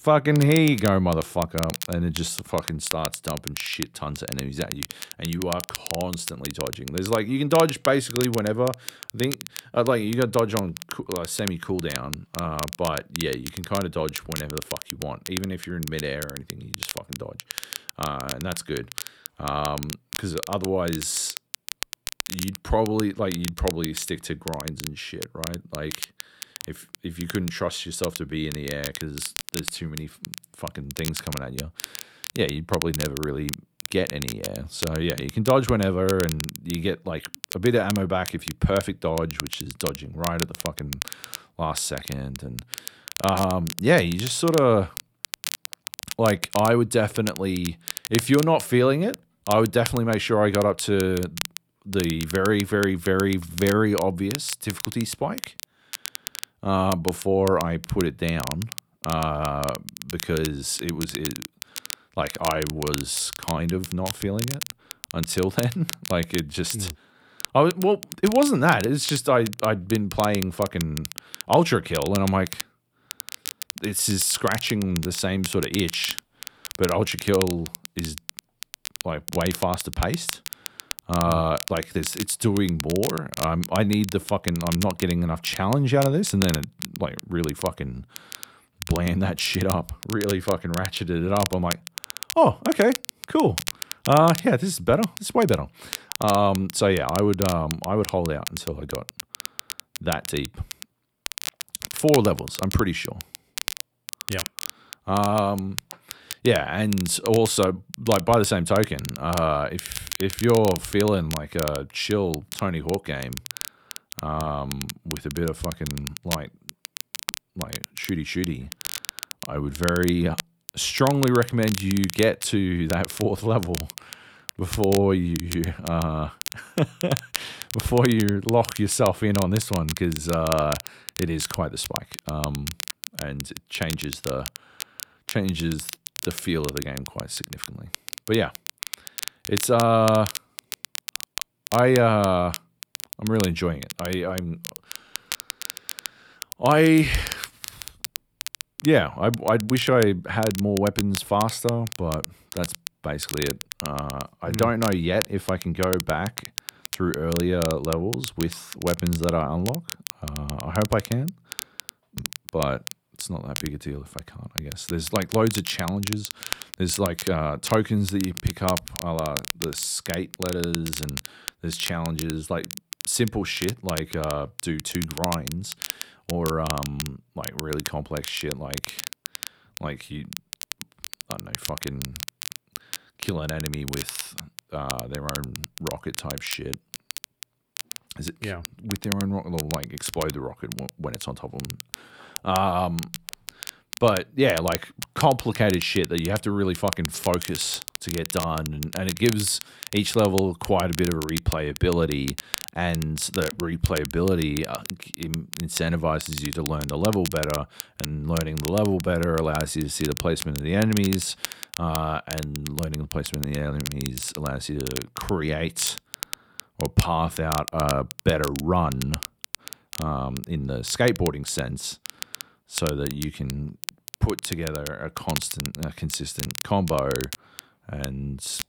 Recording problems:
crackle, like an old record; loud; 9 dB below the speech

